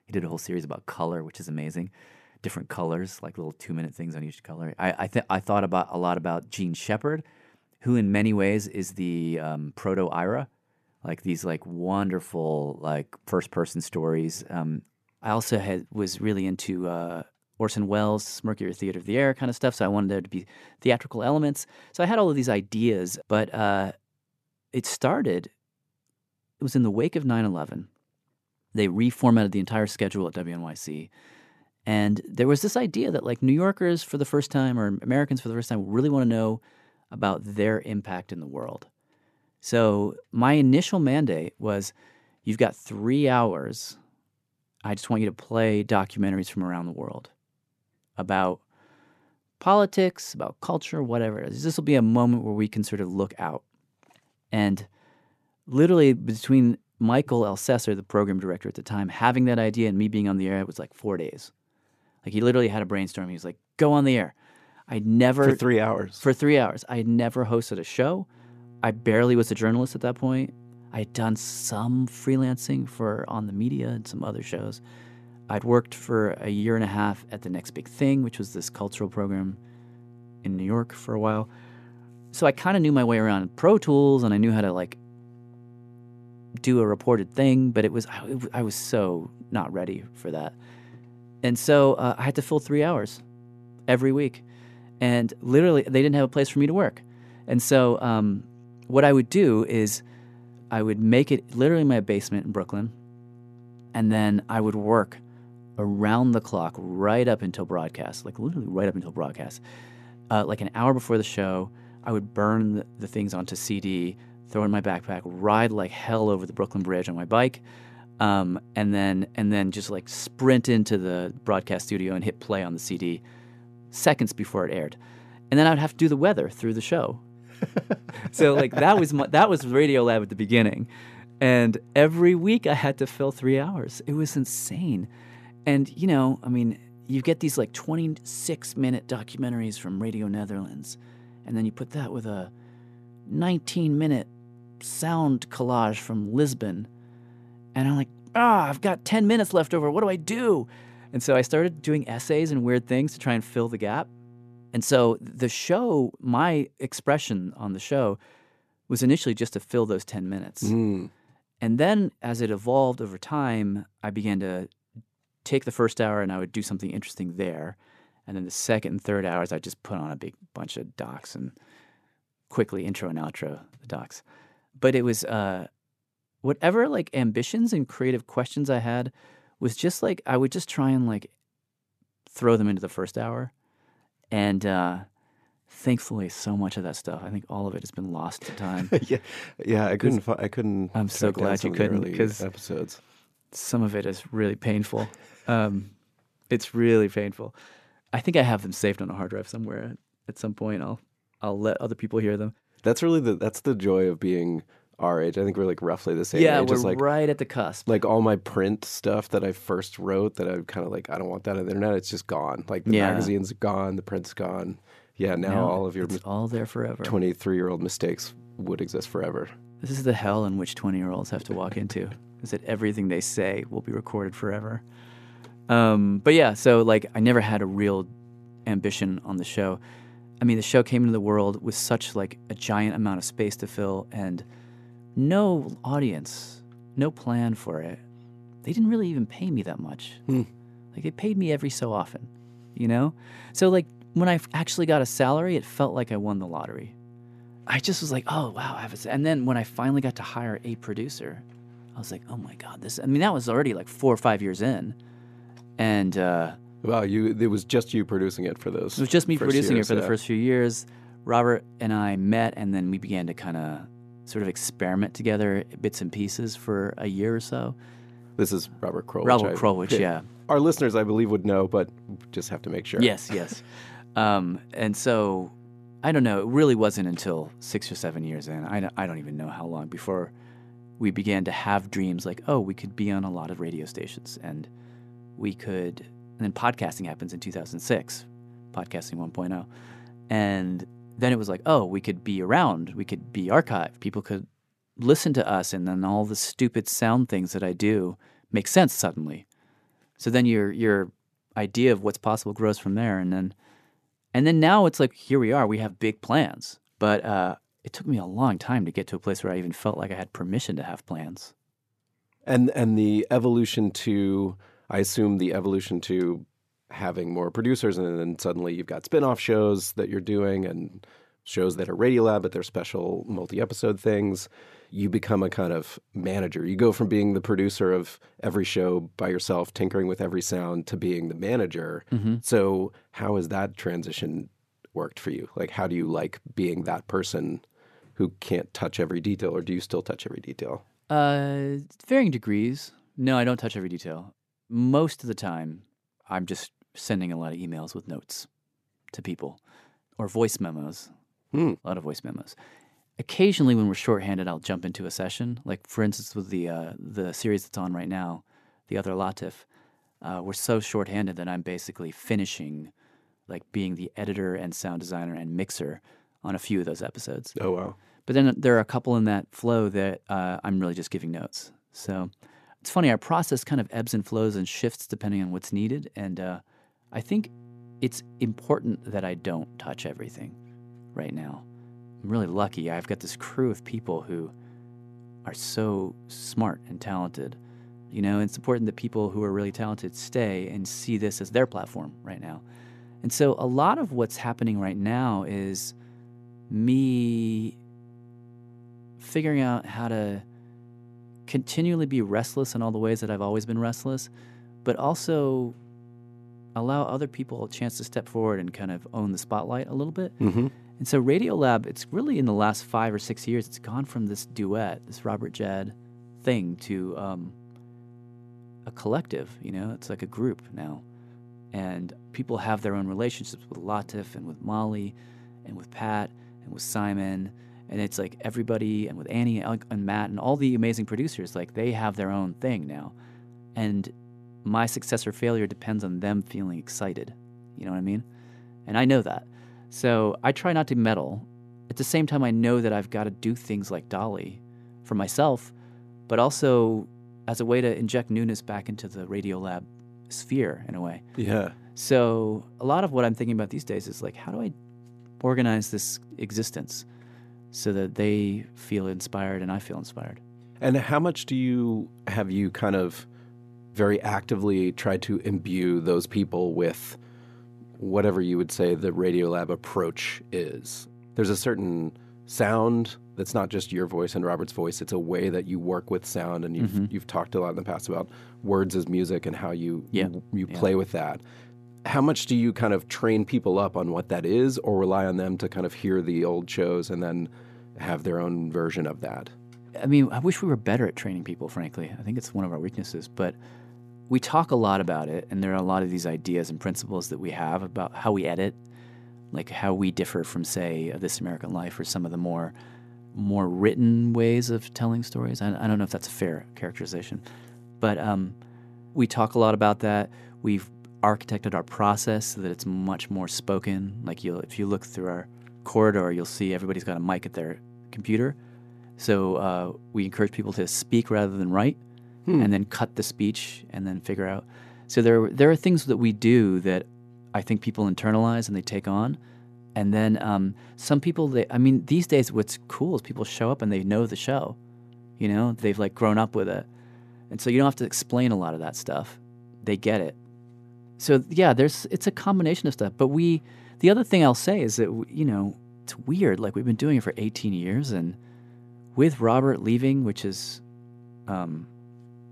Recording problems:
electrical hum; faint; from 1:08 to 2:35, from 3:38 to 4:54 and from 6:17 on; 60 Hz, 30 dB below the speech

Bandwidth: 14 kHz